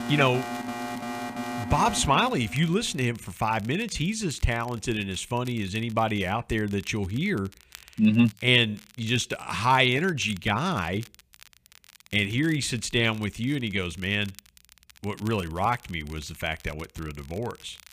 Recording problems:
crackle, like an old record; faint; 25 dB below the speech
alarm; noticeable; until 3 s; peak 6 dB below the speech

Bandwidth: 15 kHz